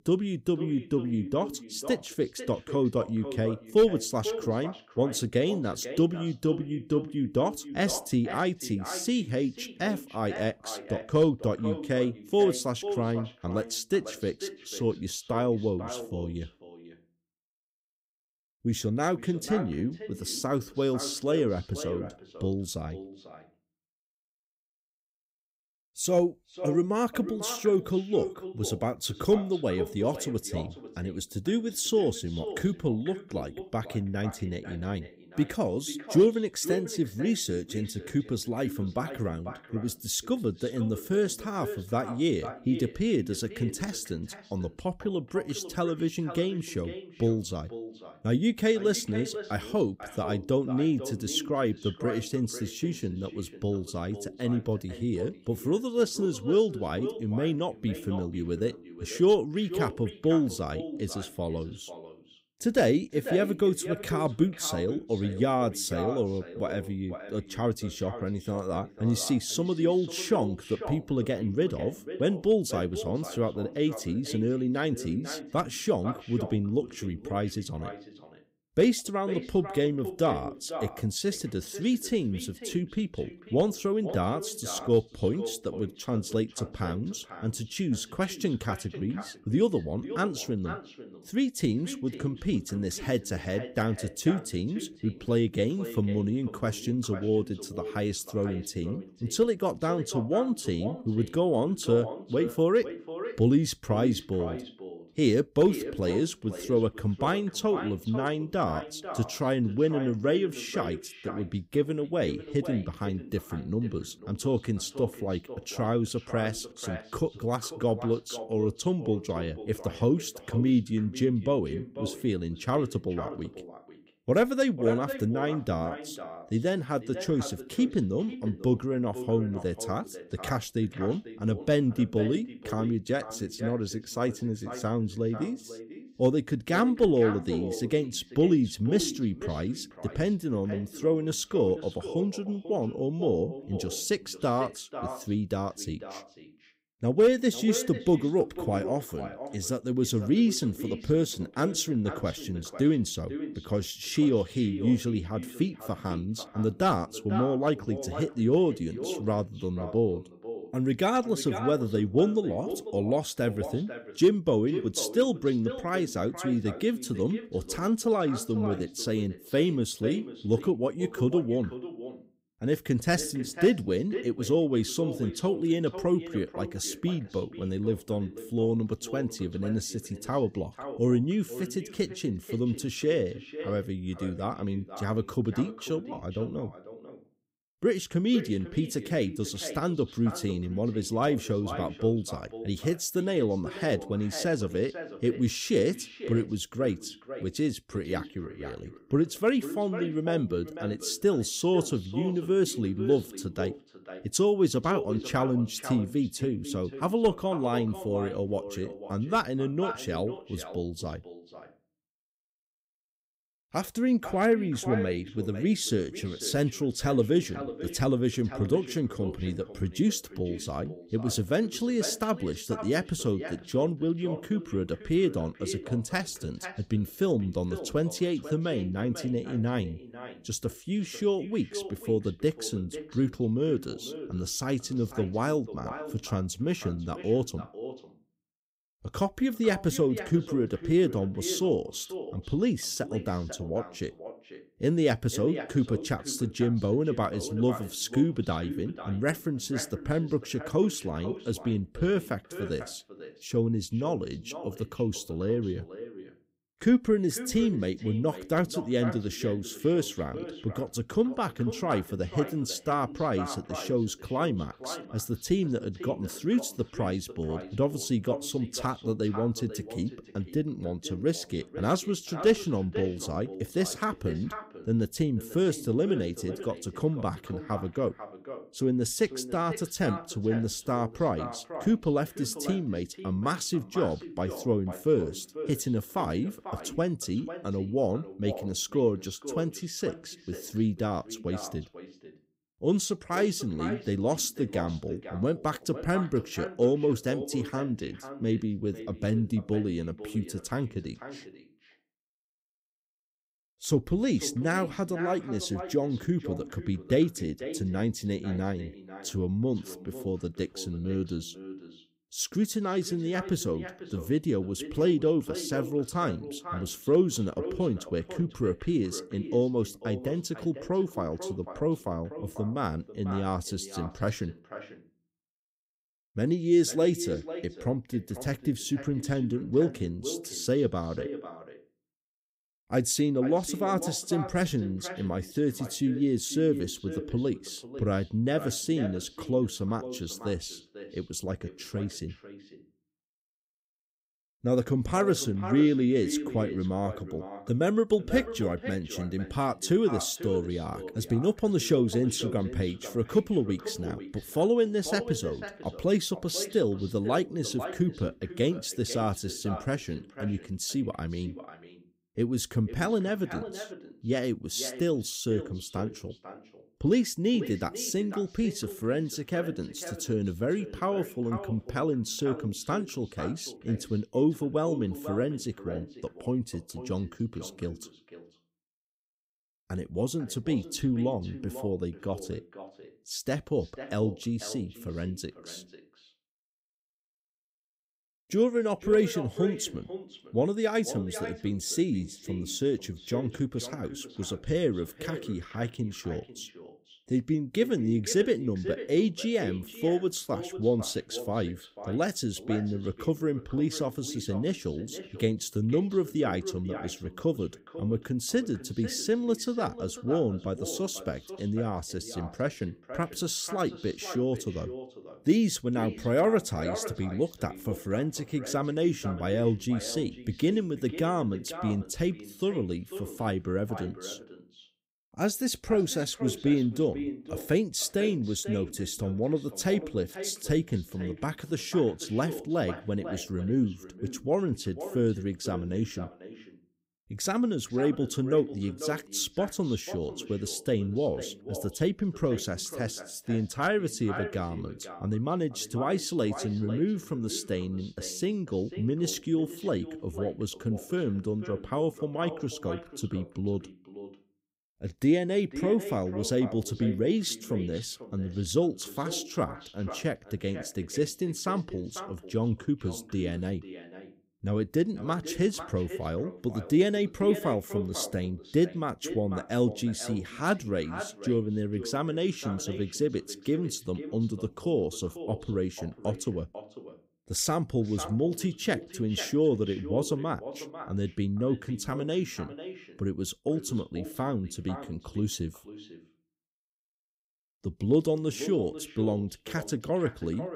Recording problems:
echo of what is said; noticeable; throughout; 490 ms later, 10 dB below the speech

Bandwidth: 15.5 kHz